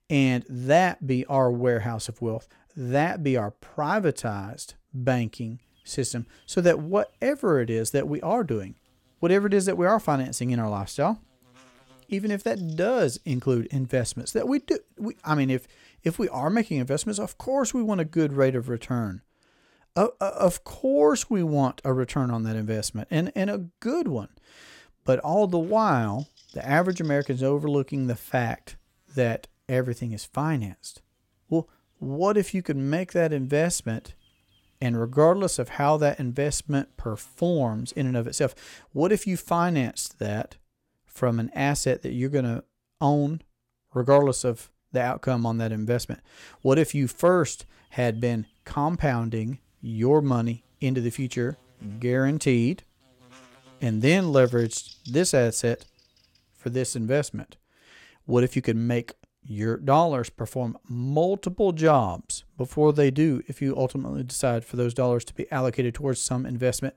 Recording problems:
electrical hum; faint; from 5.5 to 19 s, from 26 to 38 s and from 47 to 57 s; 50 Hz, 30 dB below the speech

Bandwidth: 16.5 kHz